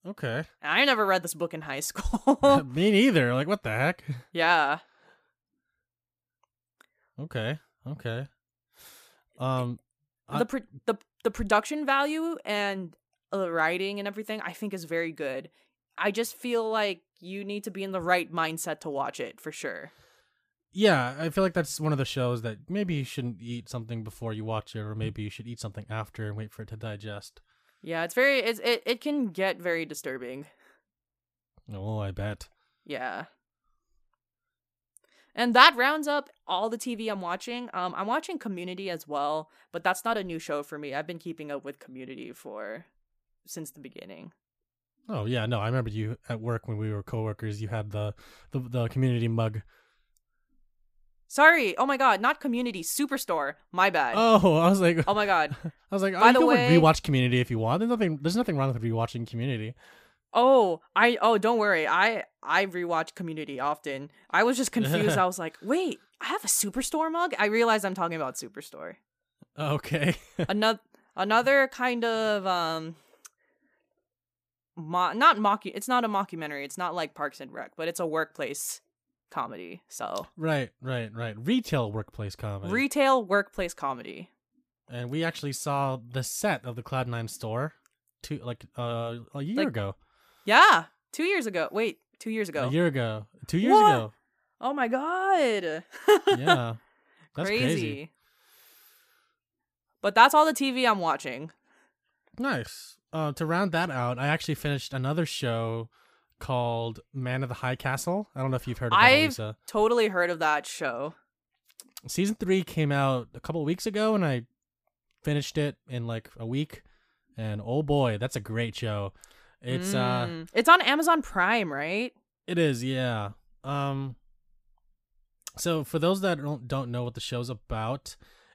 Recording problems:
none

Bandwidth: 15 kHz